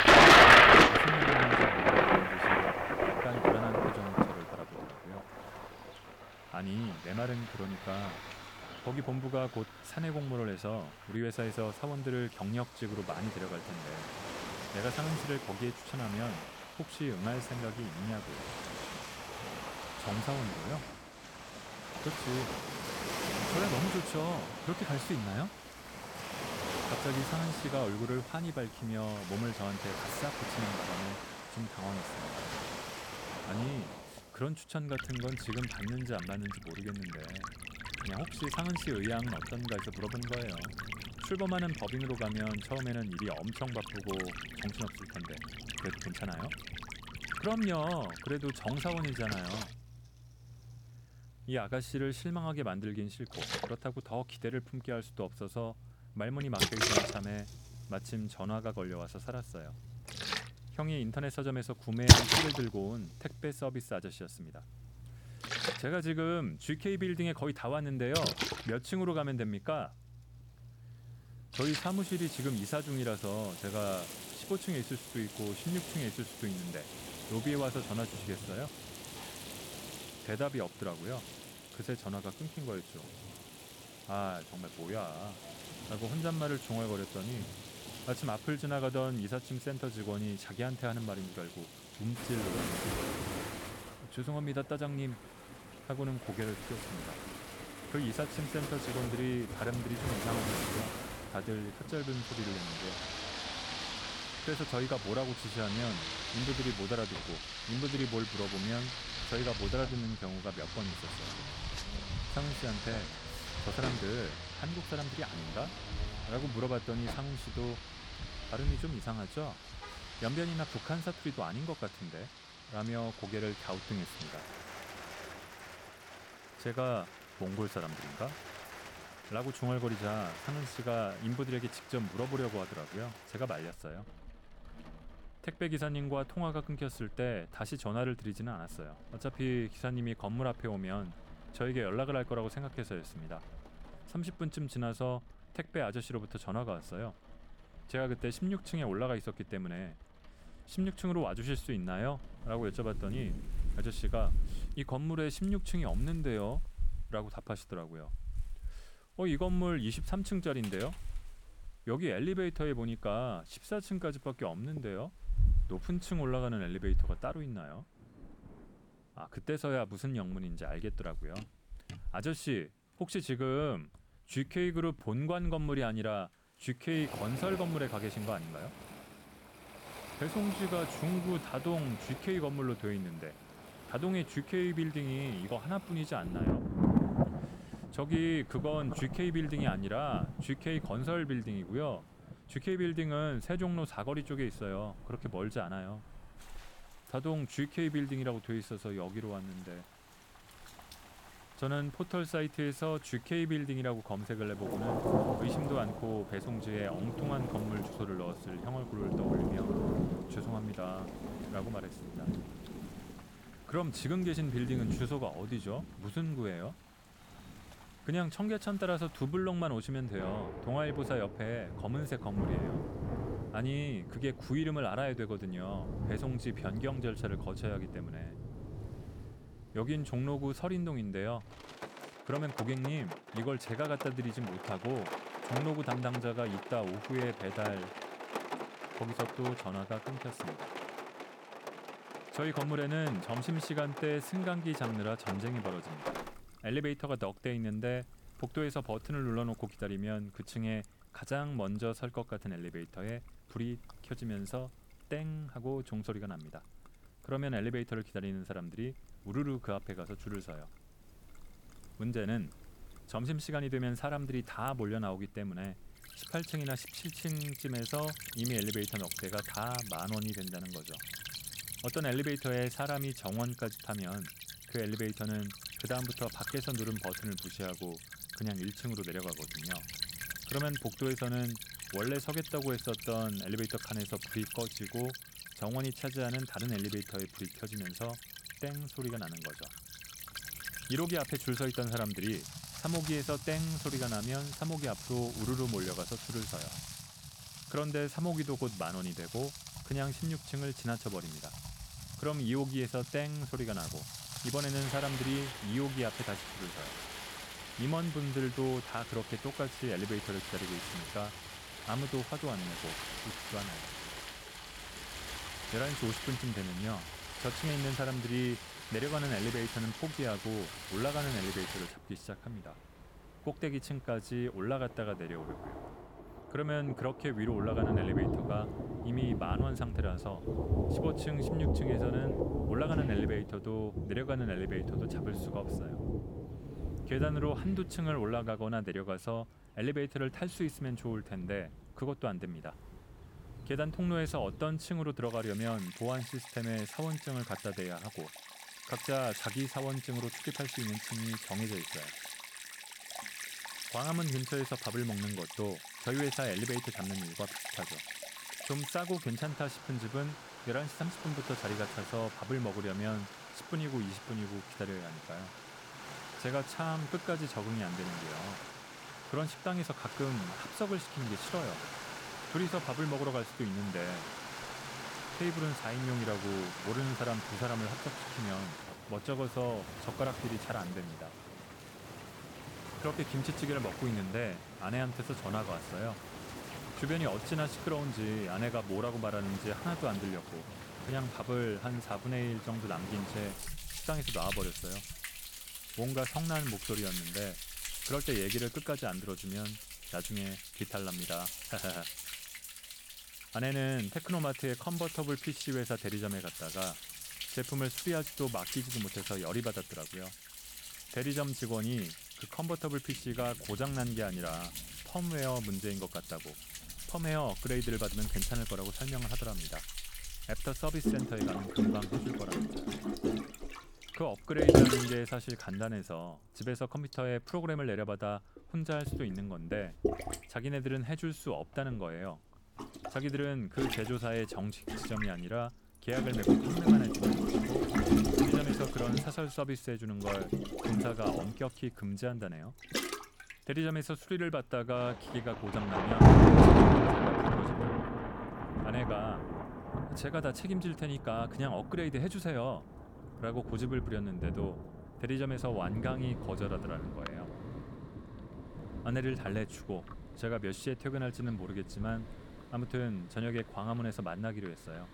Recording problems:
rain or running water; very loud; throughout; 2 dB above the speech

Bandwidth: 18 kHz